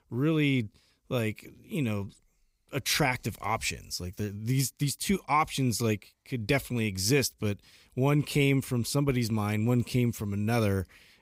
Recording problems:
none

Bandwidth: 15.5 kHz